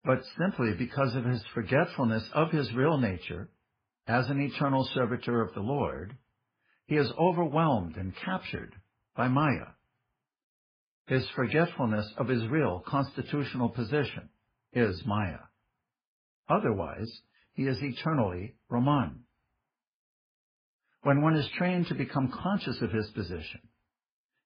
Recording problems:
garbled, watery; badly; nothing above 5 kHz

